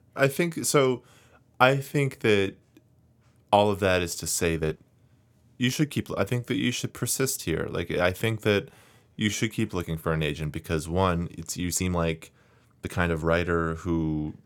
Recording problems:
uneven, jittery; strongly; from 1.5 to 13 s

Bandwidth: 17.5 kHz